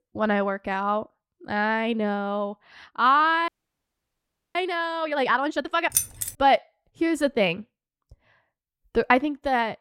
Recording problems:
audio freezing; at 3.5 s for 1 s
jangling keys; loud; at 6 s; peak level with the speech

